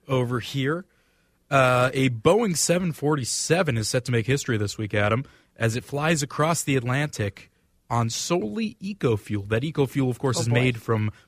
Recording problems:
none

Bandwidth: 15 kHz